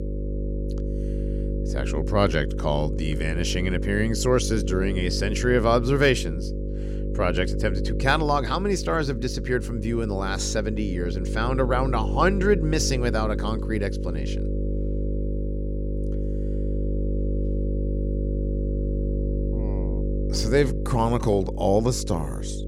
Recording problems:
electrical hum; noticeable; throughout; 50 Hz, 10 dB below the speech

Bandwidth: 16 kHz